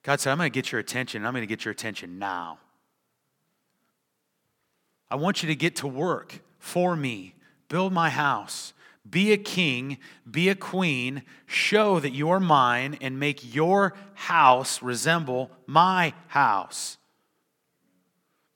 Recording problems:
none

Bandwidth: 17.5 kHz